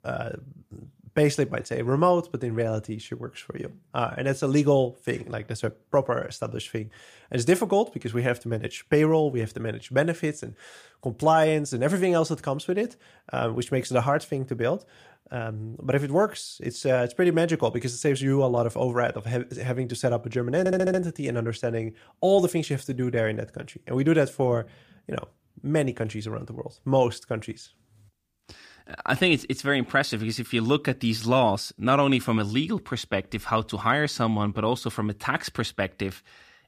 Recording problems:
audio stuttering; at 21 s

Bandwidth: 15 kHz